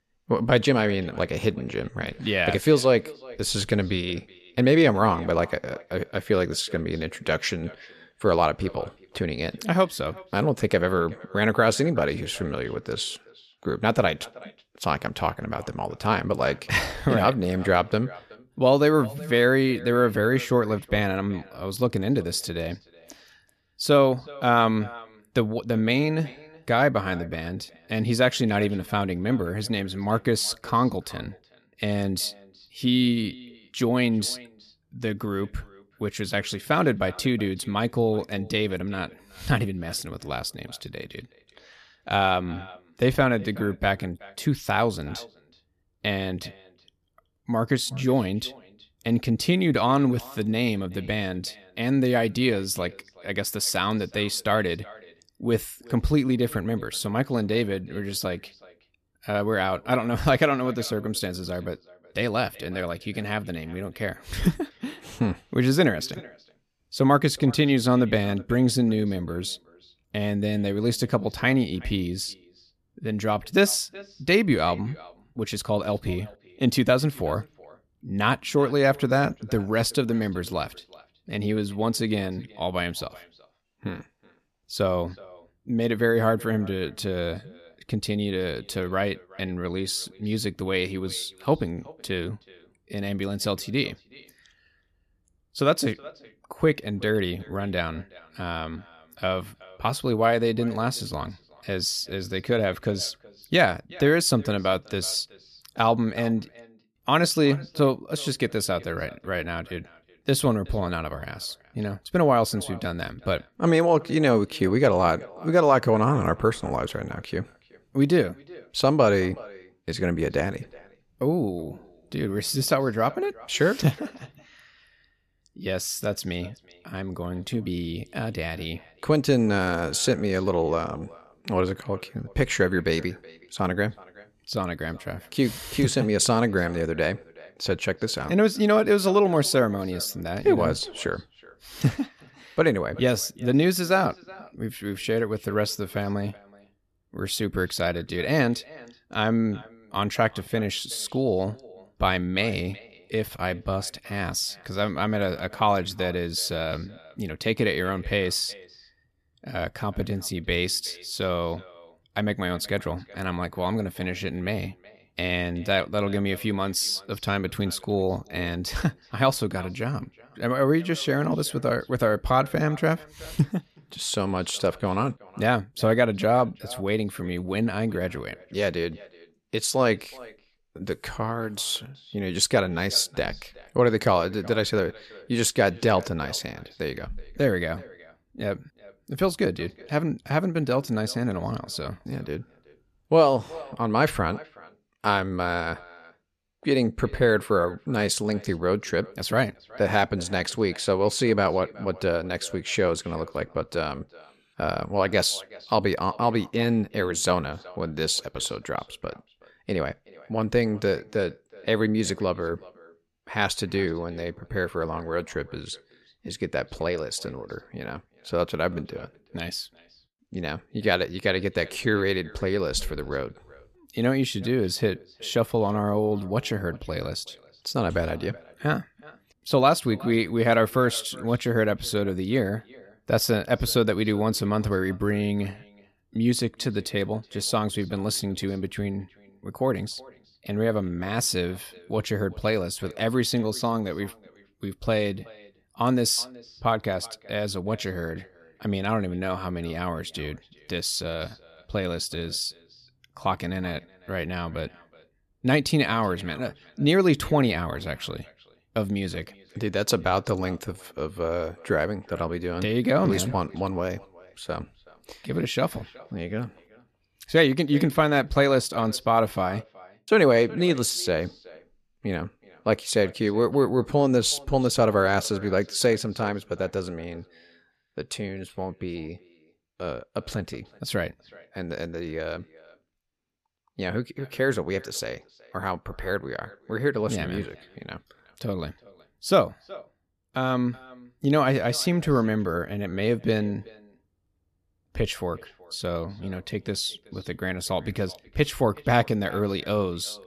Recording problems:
echo of what is said; faint; throughout; 370 ms later, 25 dB below the speech

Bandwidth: 14 kHz